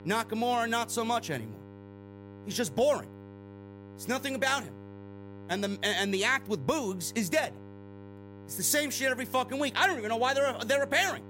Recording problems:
electrical hum; faint; throughout; 50 Hz, 20 dB below the speech

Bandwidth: 16 kHz